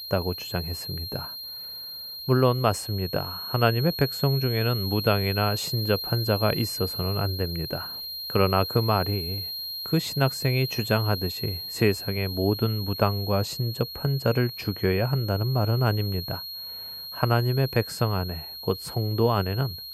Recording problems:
high-pitched whine; loud; throughout; 4.5 kHz, 6 dB below the speech

